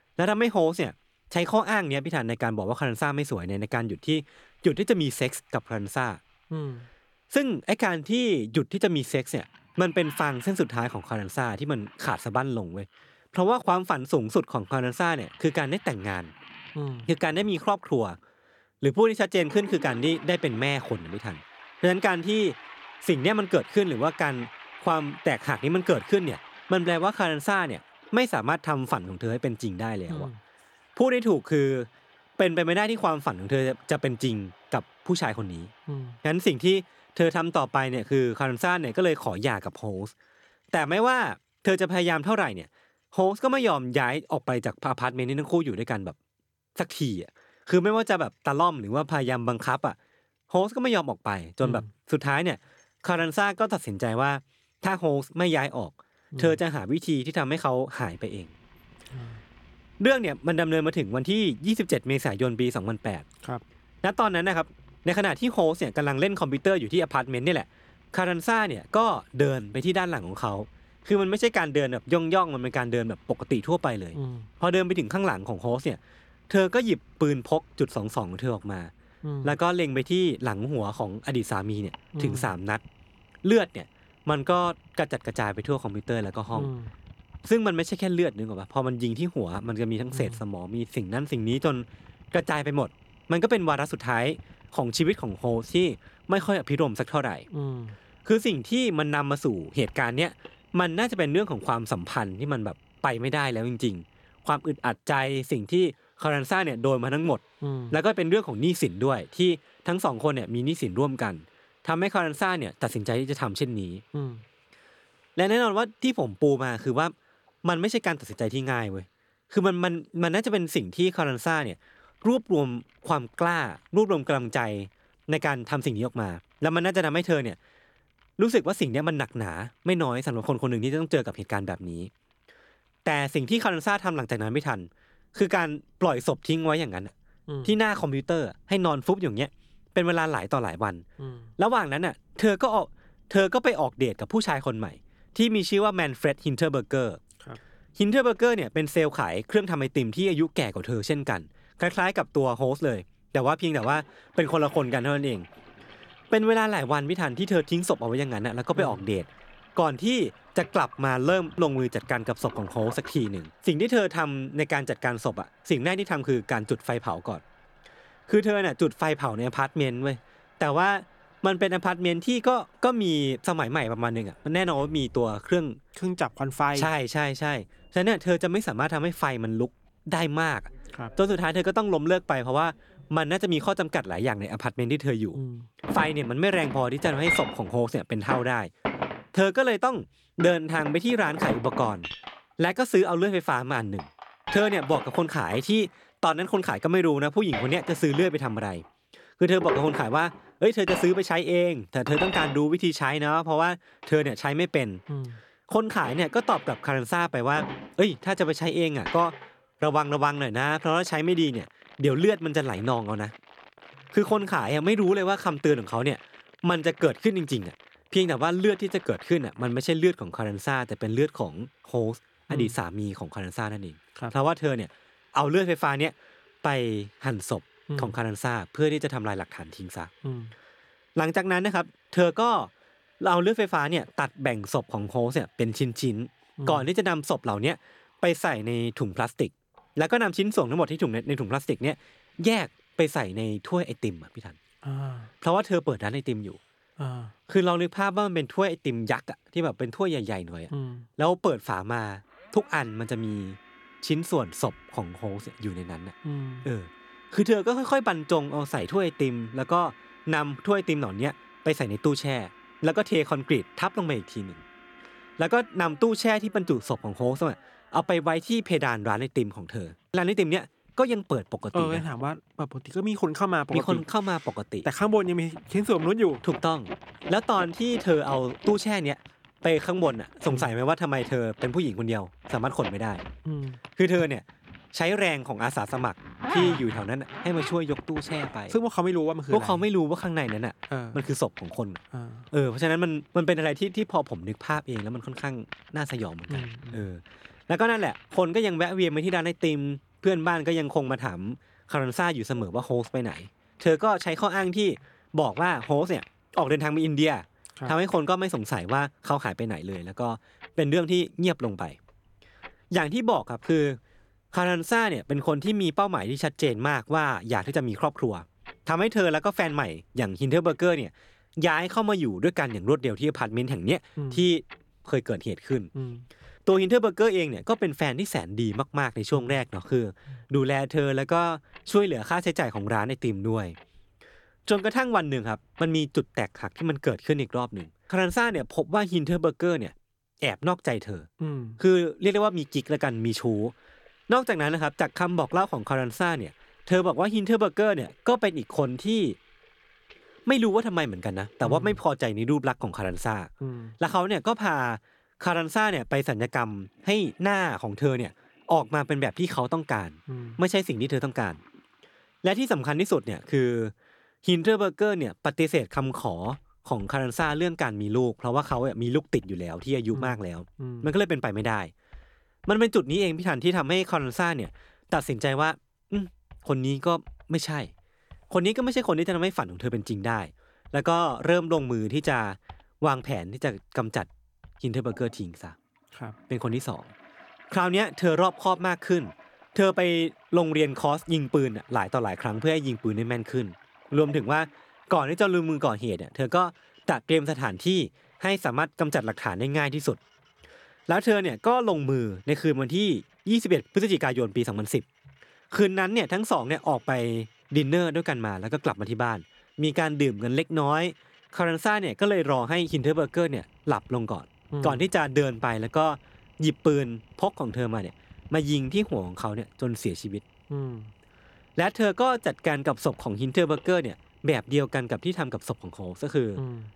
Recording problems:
household noises; noticeable; throughout; 15 dB below the speech

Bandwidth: 18 kHz